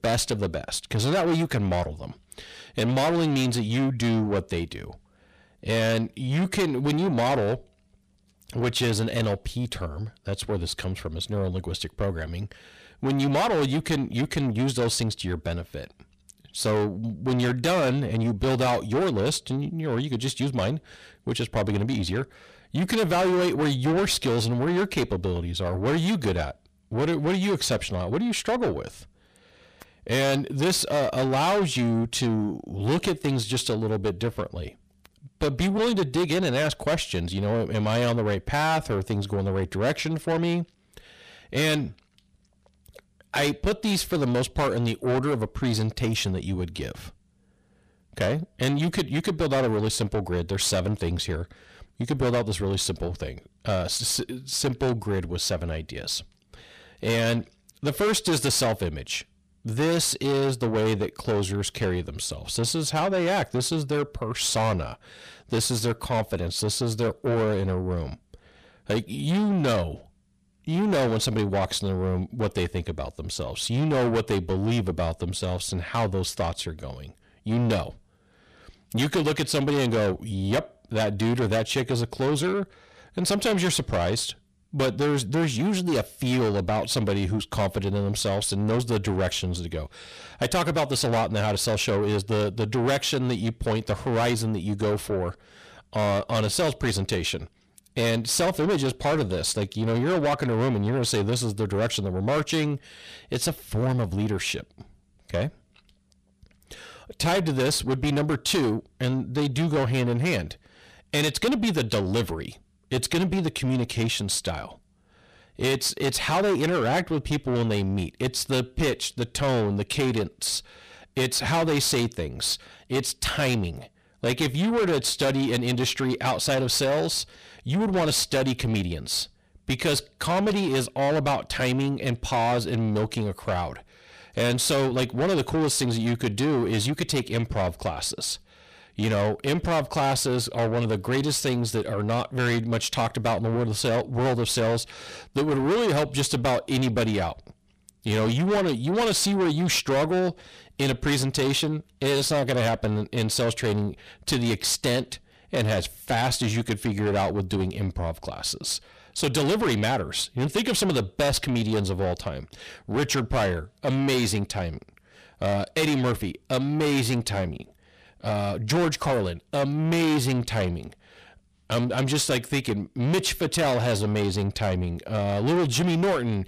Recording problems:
distortion; heavy; 6 dB below the speech

